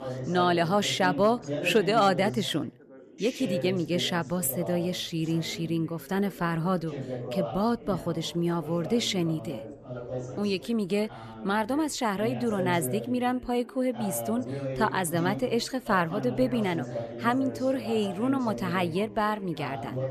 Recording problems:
background chatter; loud; throughout; 4 voices, 9 dB below the speech

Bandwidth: 14 kHz